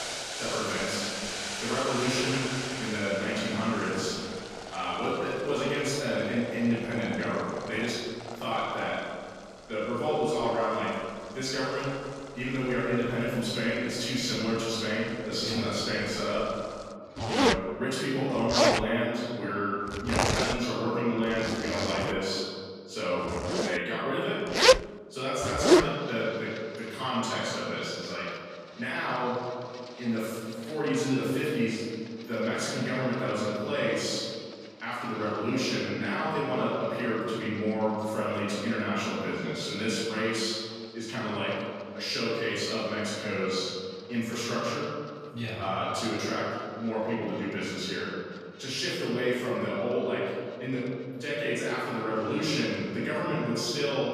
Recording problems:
room echo; strong; dies away in 1.9 s
off-mic speech; far
household noises; very loud; throughout; as loud as the speech

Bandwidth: 14.5 kHz